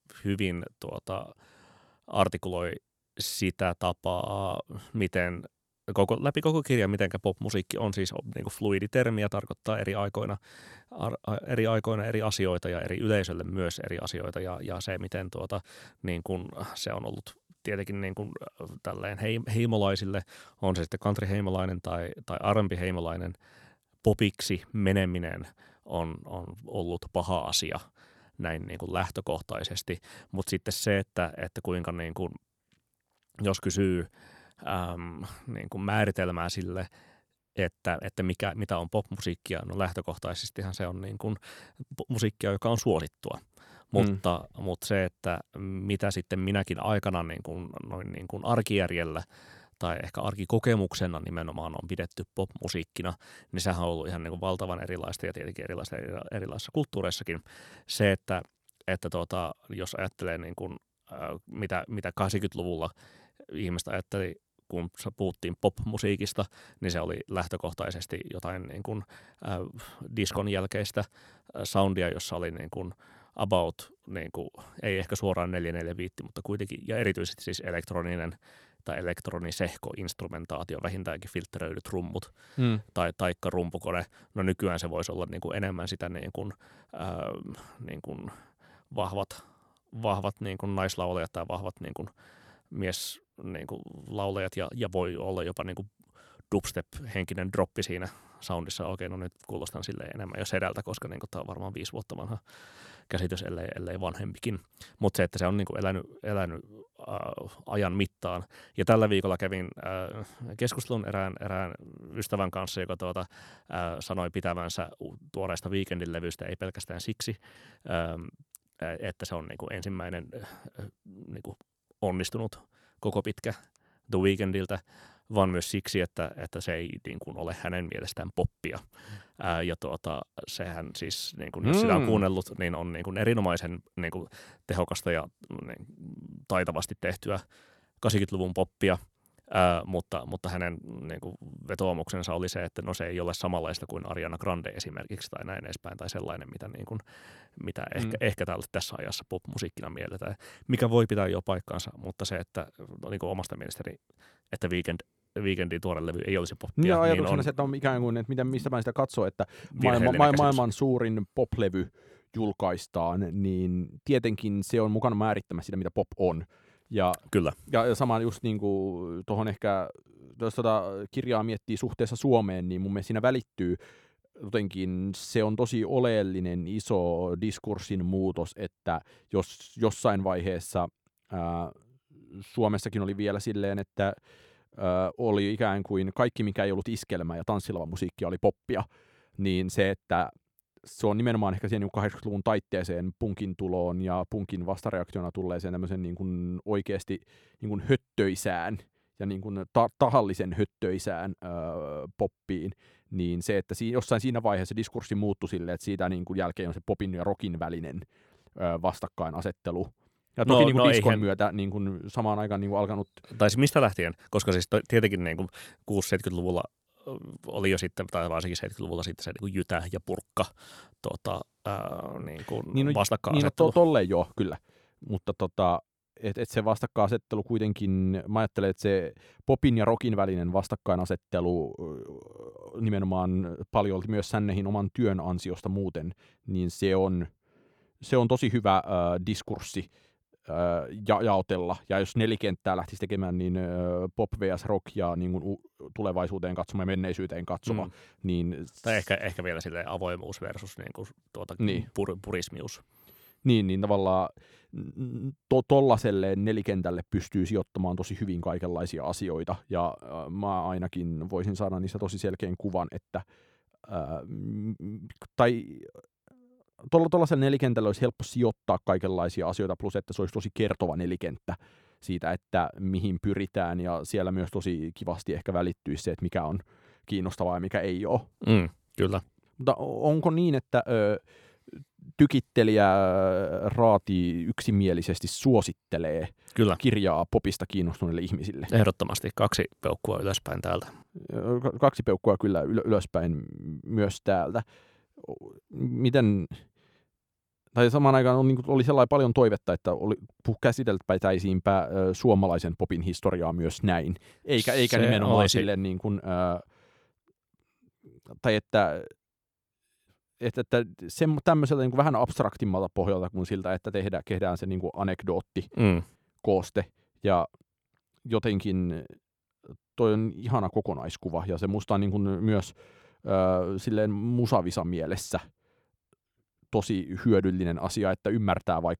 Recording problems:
none

